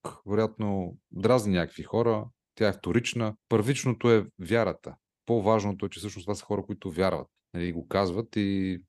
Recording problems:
none

